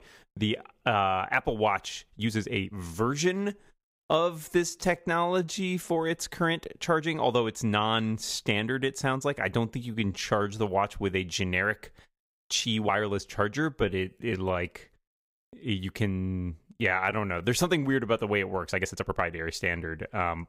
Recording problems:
uneven, jittery; strongly; from 0.5 to 19 s

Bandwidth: 15.5 kHz